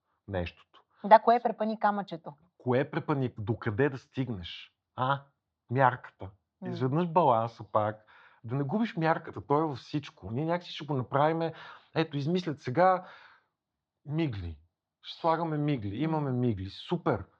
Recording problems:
muffled; slightly; fading above 4 kHz

